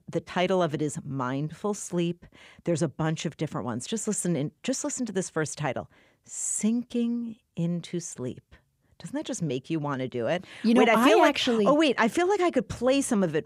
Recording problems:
none

